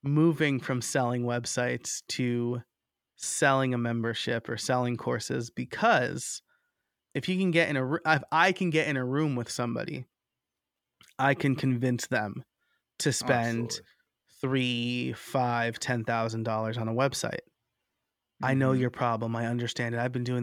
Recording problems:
abrupt cut into speech; at the end

